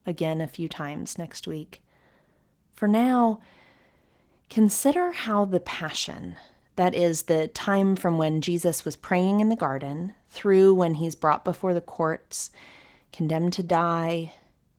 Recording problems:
garbled, watery; slightly

